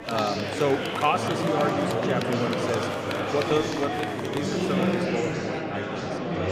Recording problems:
murmuring crowd; very loud; throughout; 2 dB above the speech

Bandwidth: 15 kHz